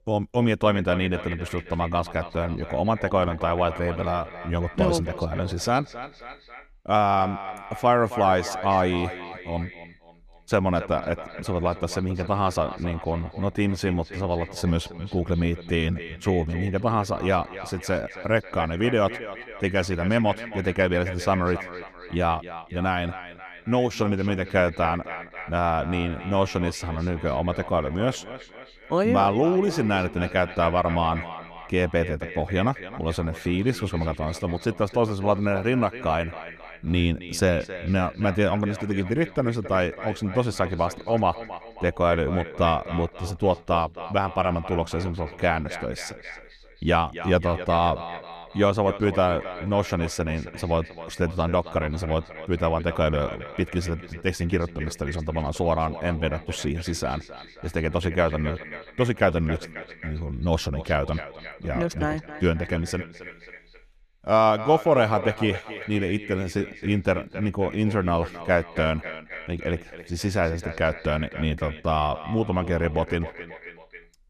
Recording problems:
echo of what is said; noticeable; throughout; 270 ms later, 15 dB below the speech

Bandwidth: 14.5 kHz